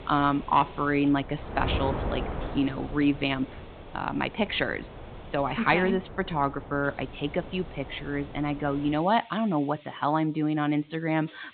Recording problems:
high frequencies cut off; severe; nothing above 4 kHz
wind noise on the microphone; occasional gusts; until 9 s; 15 dB below the speech
hiss; faint; throughout; 25 dB below the speech

